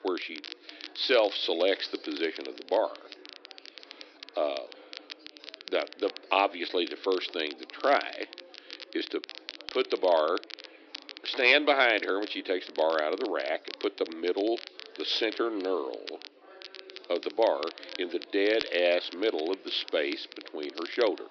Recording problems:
thin; somewhat; fading below 300 Hz
high frequencies cut off; noticeable; nothing above 5.5 kHz
crackle, like an old record; noticeable; 15 dB below the speech
chatter from many people; faint; throughout; 25 dB below the speech

